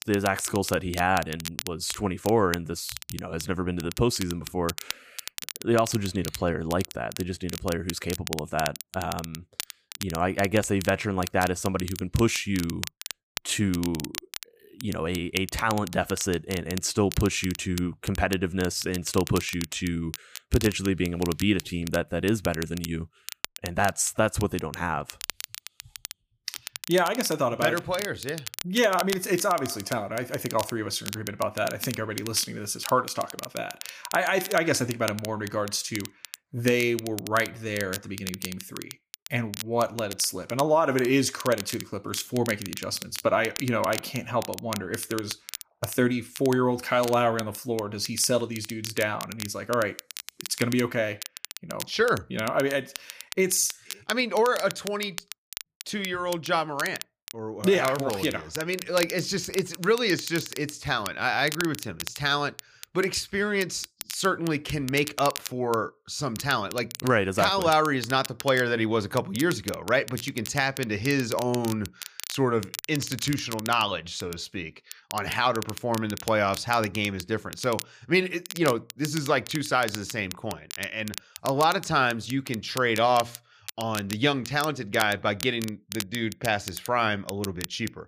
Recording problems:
crackle, like an old record; noticeable; 10 dB below the speech

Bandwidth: 15 kHz